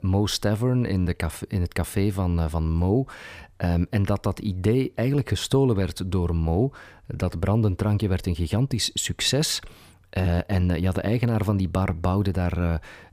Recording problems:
none

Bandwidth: 15 kHz